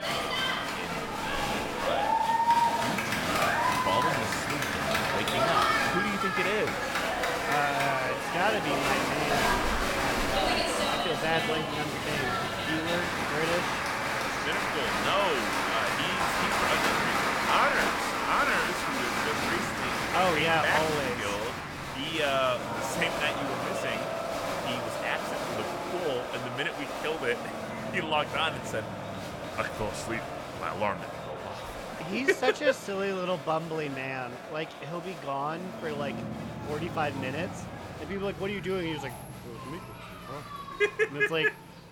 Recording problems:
crowd noise; very loud; throughout; 2 dB above the speech
low rumble; faint; throughout; 20 dB below the speech

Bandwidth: 17.5 kHz